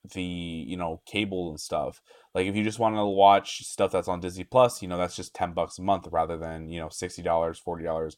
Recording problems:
none

